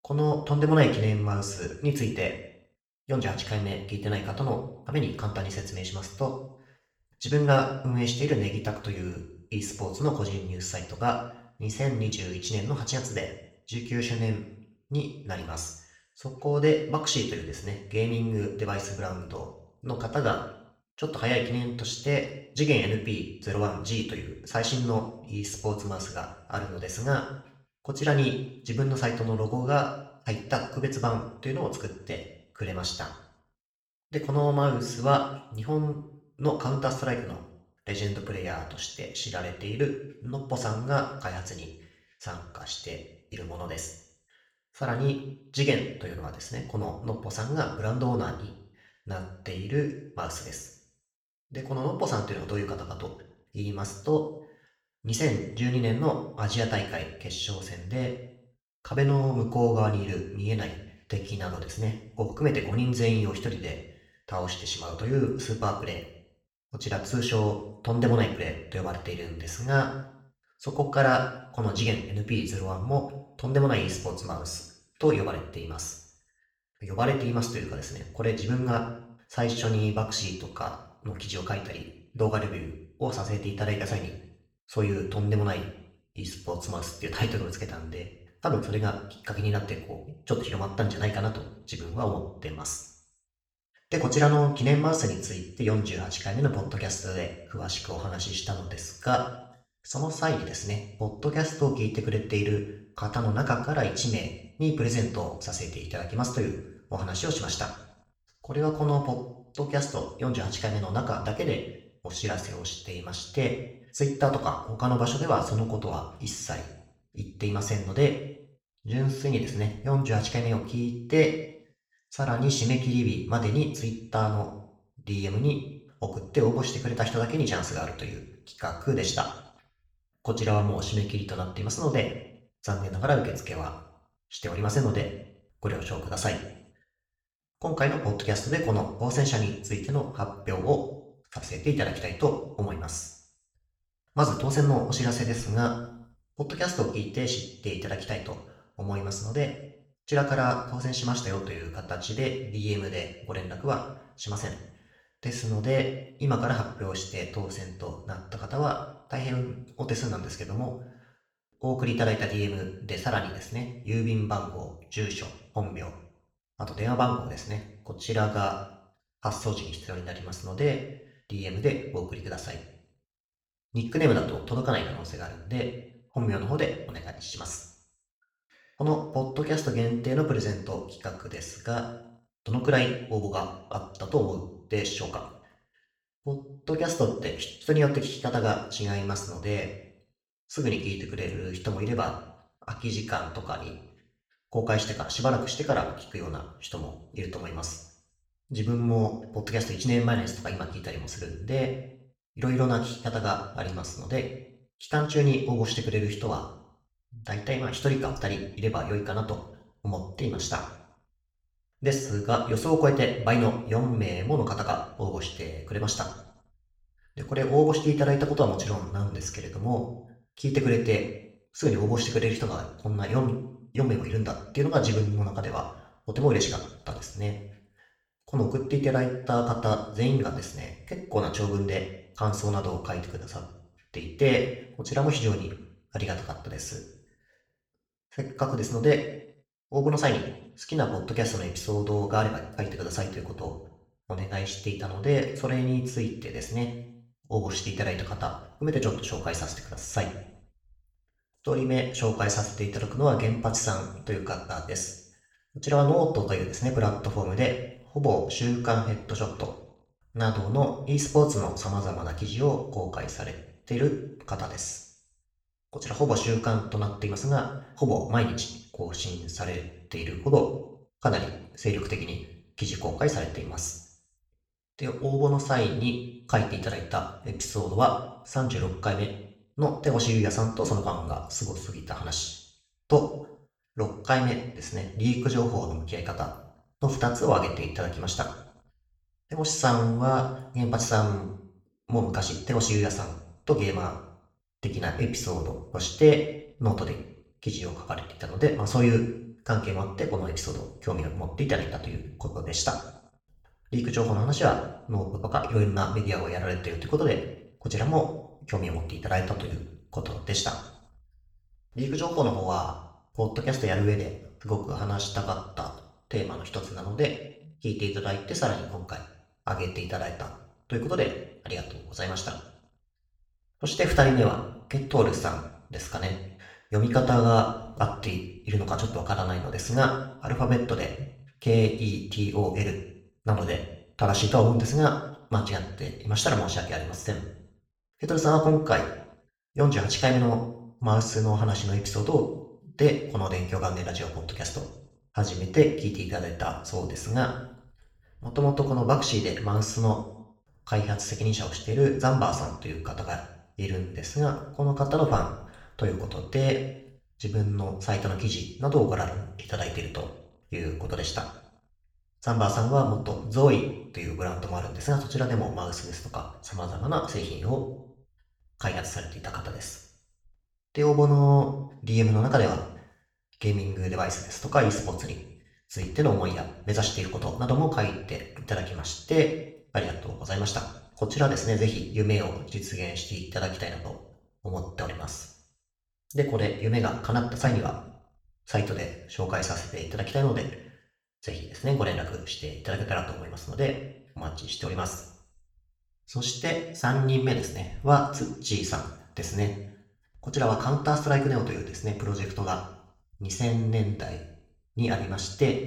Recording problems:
off-mic speech; far
room echo; noticeable; dies away in 0.6 s

